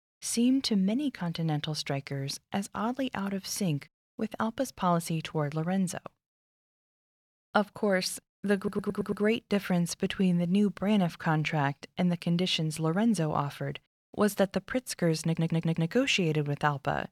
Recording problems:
audio stuttering; at 8.5 s and at 15 s

